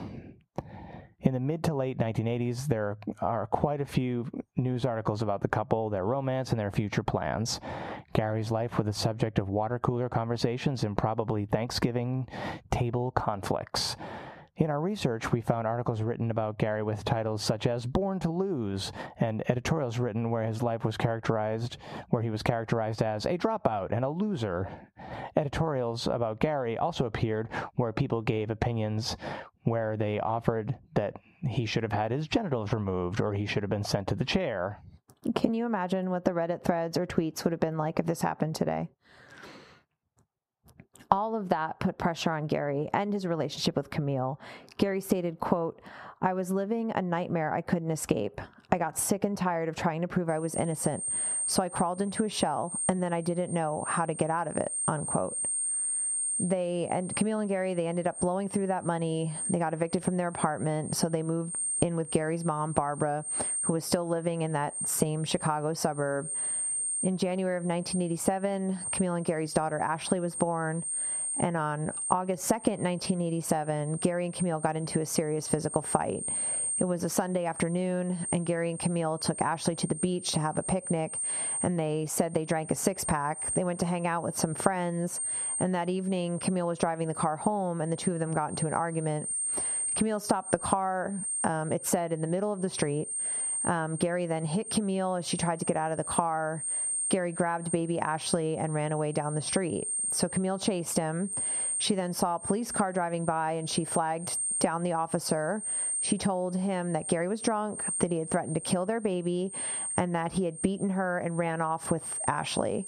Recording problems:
squashed, flat; heavily
muffled; very slightly; fading above 1.5 kHz
high-pitched whine; loud; from 50 s on; 8.5 kHz, 3 dB below the speech

